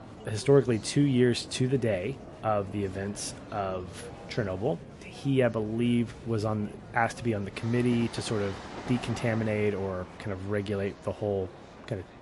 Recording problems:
garbled, watery; slightly; nothing above 11 kHz
train or aircraft noise; noticeable; throughout; 15 dB below the speech
chatter from many people; faint; throughout; 20 dB below the speech

